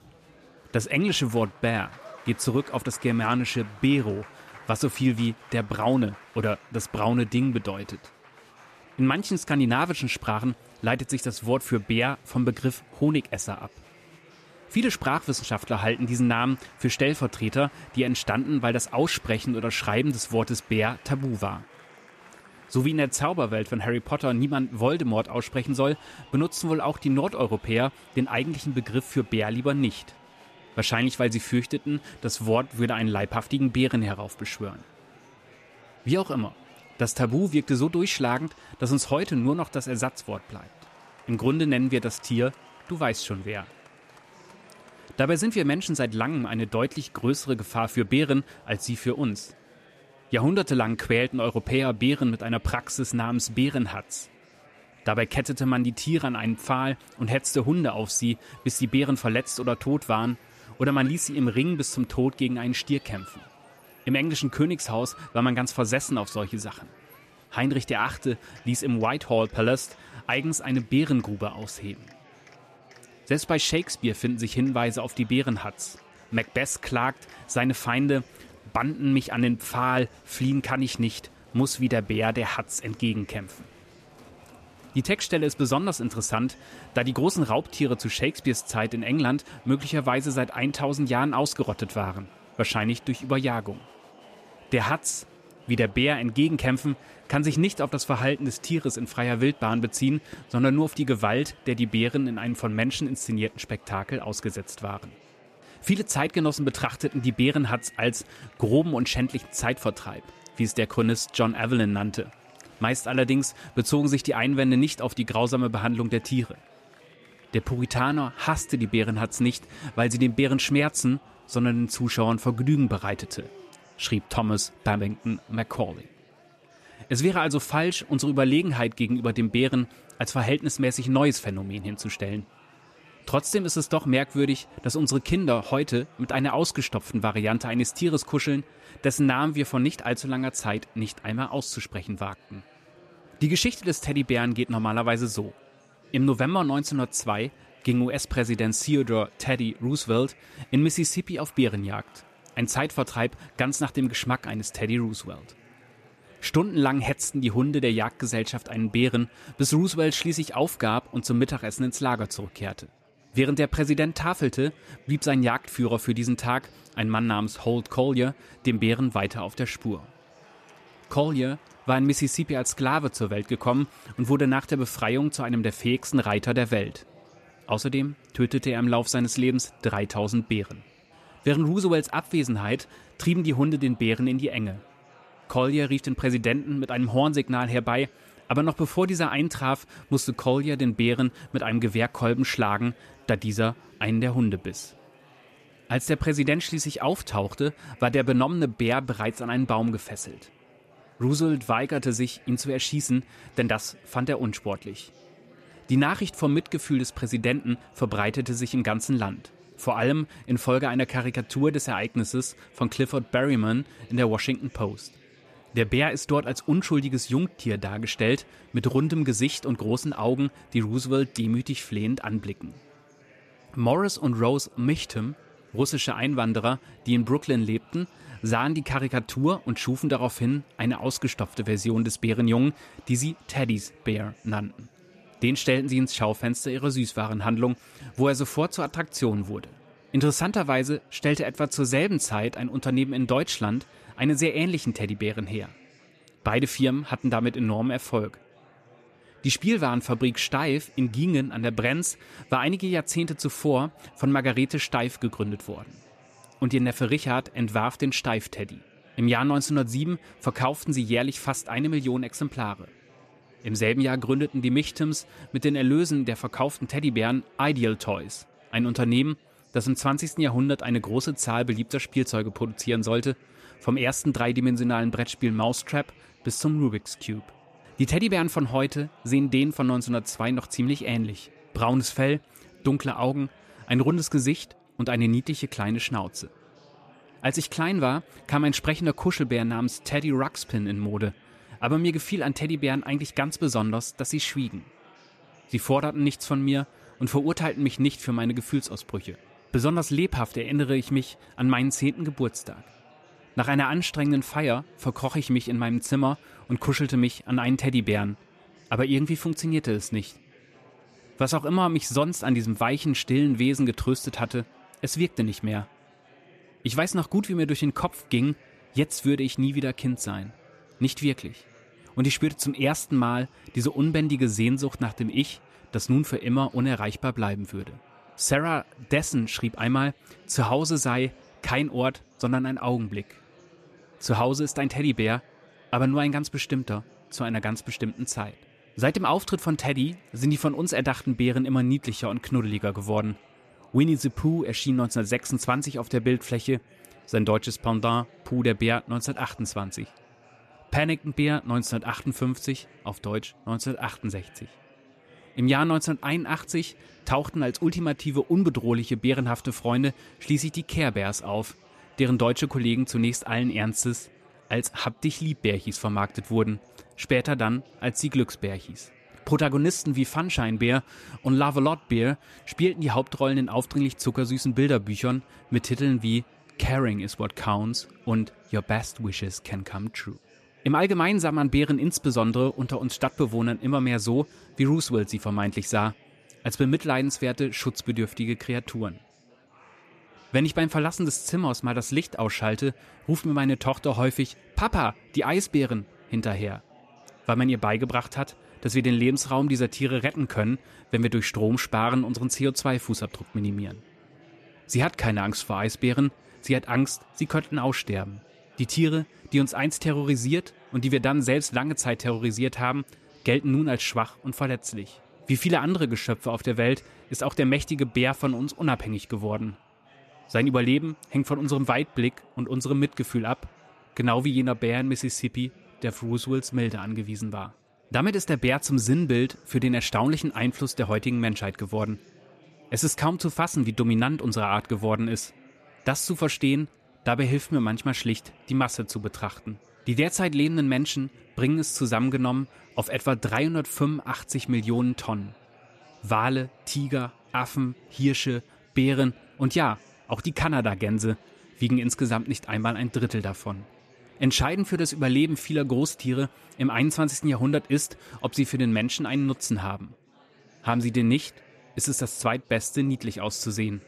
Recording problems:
chatter from many people; faint; throughout; 25 dB below the speech

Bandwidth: 14 kHz